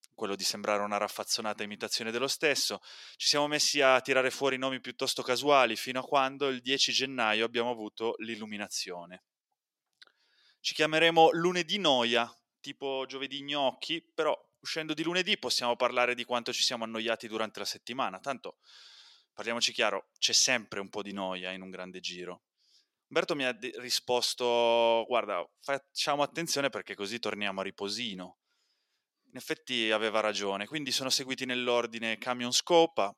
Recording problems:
thin; somewhat; fading below 450 Hz

